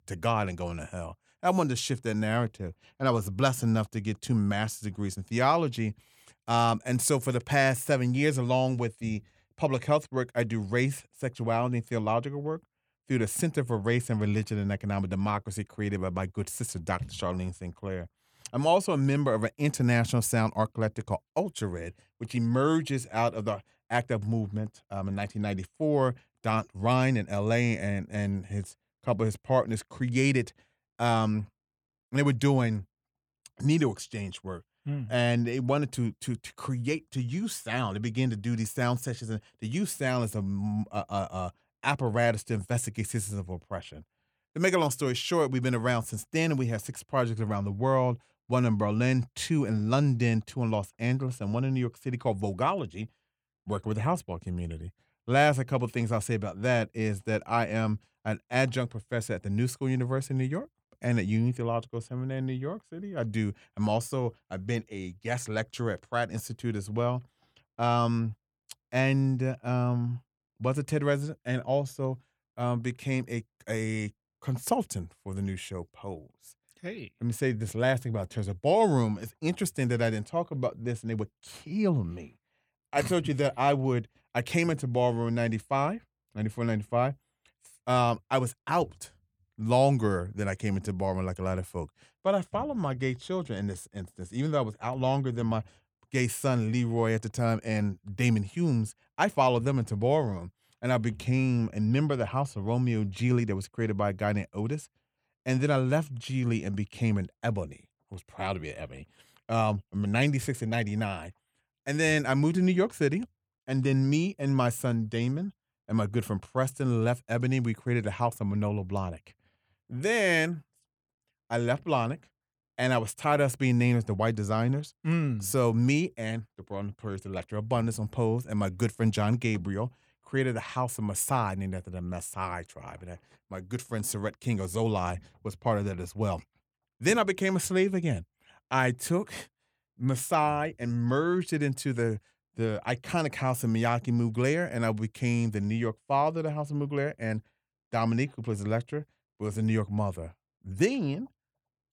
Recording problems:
none

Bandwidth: 18 kHz